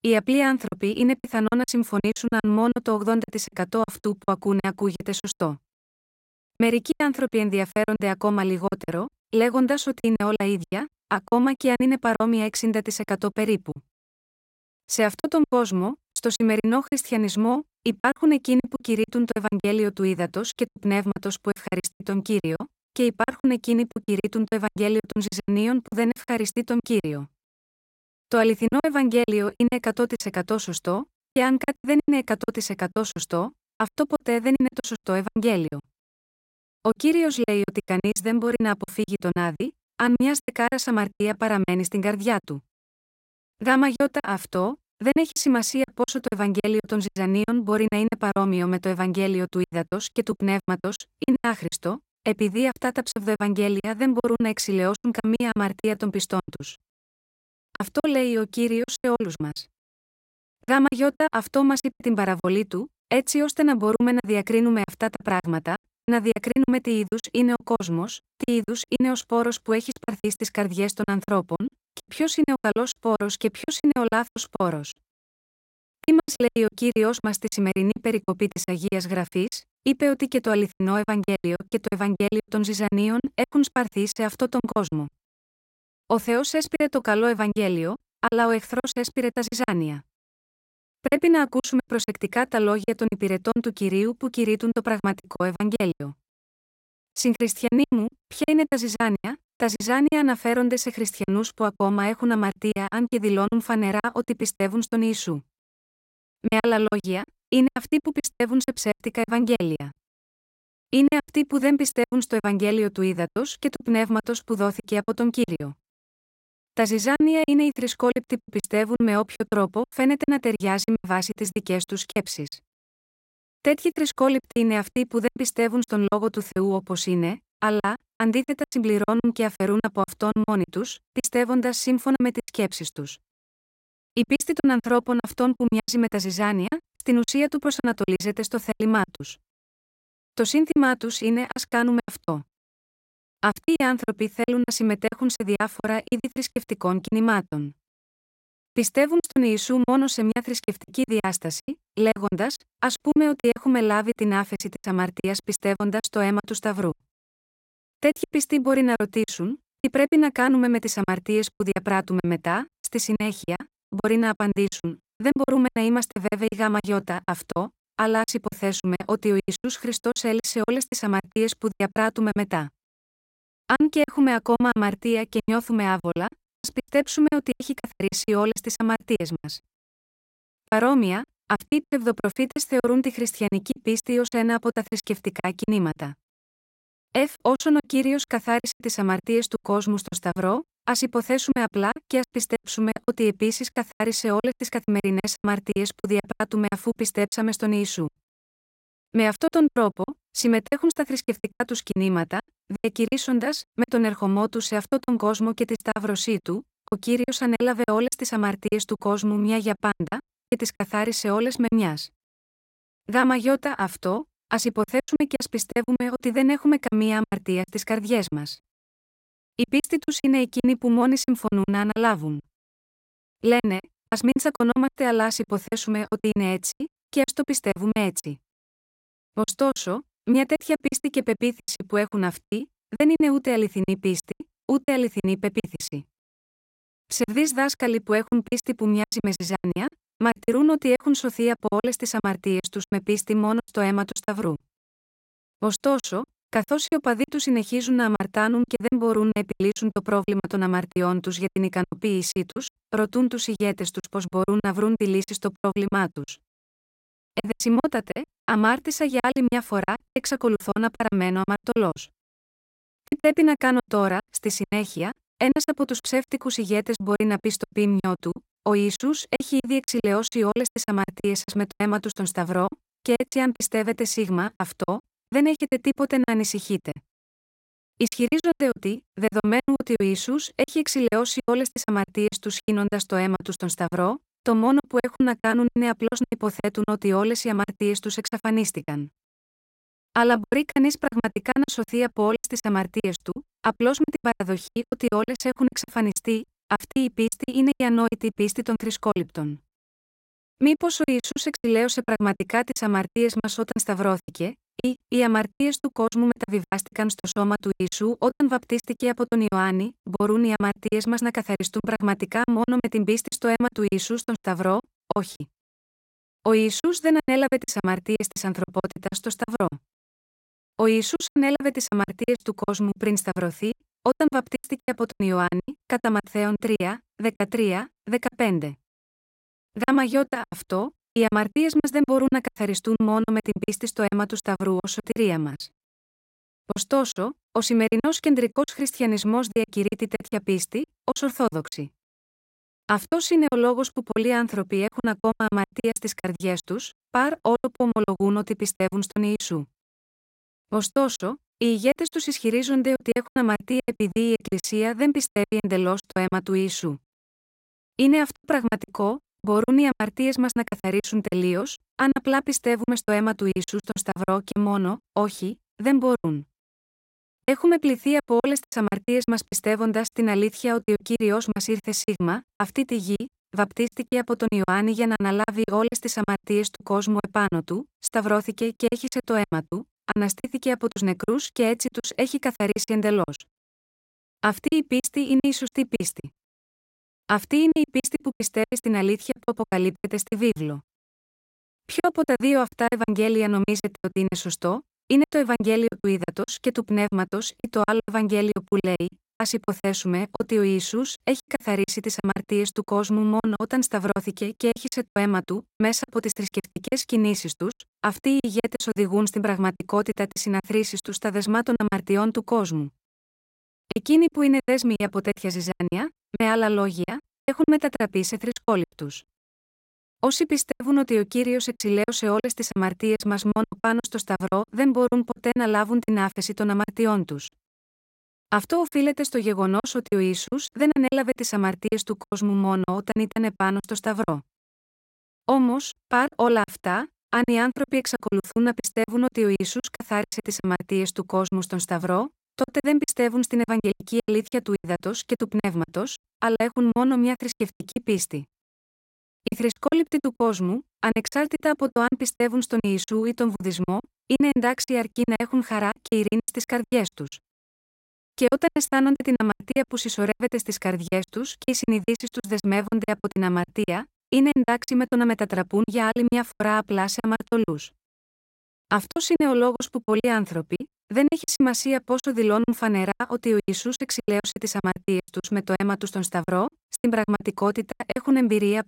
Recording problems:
choppy; very; 15% of the speech affected

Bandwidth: 16 kHz